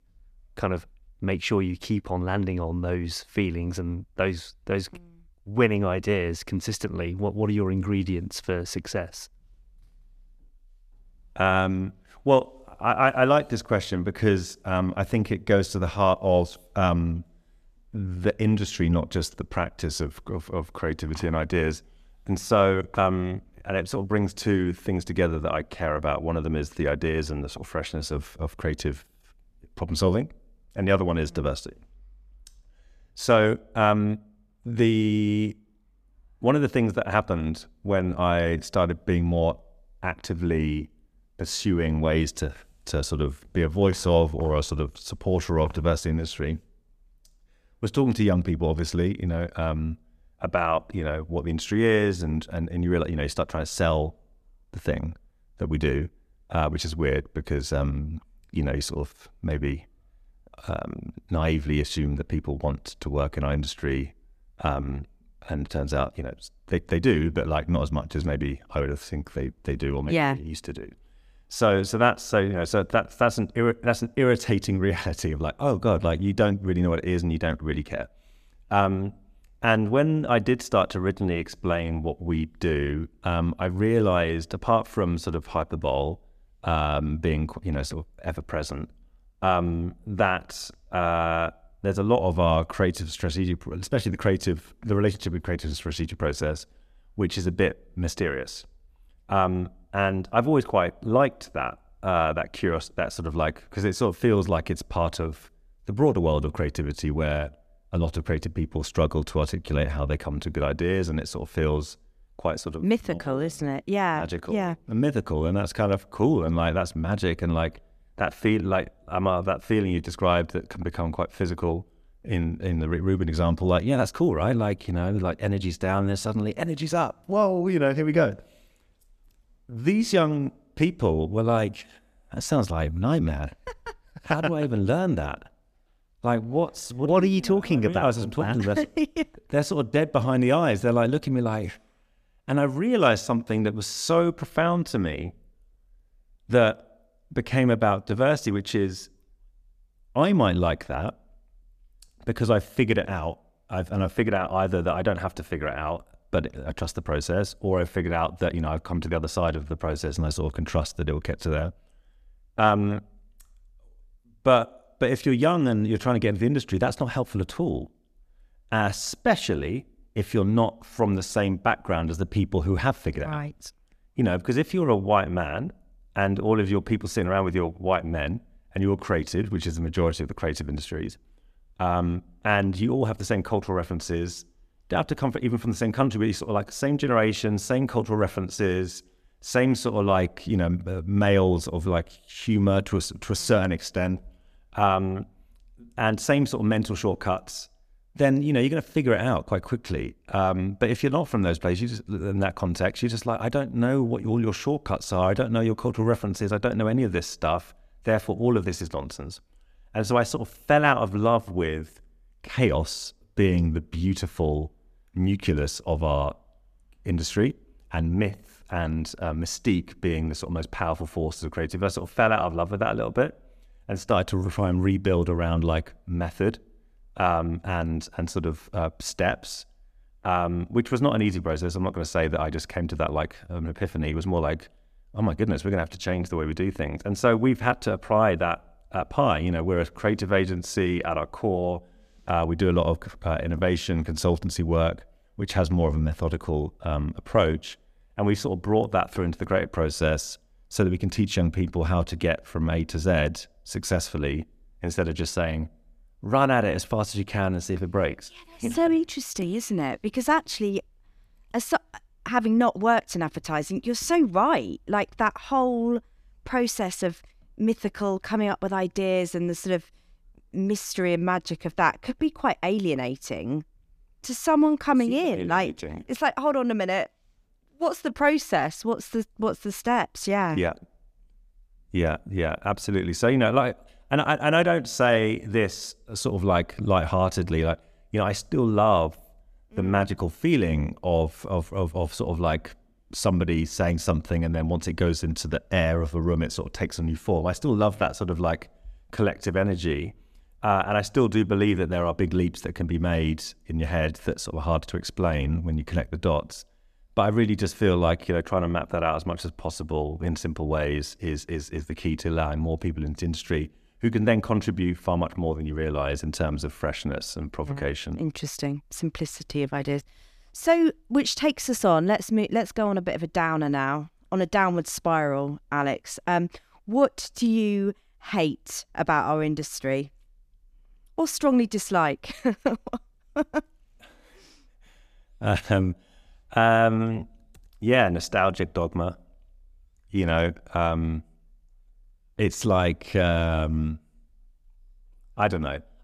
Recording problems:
none

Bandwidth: 14.5 kHz